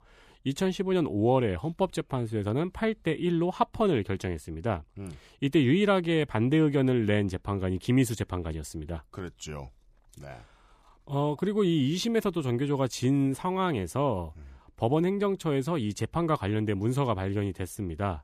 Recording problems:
none

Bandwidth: 14.5 kHz